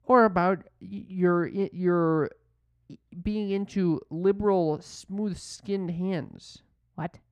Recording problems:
muffled; slightly; fading above 3 kHz

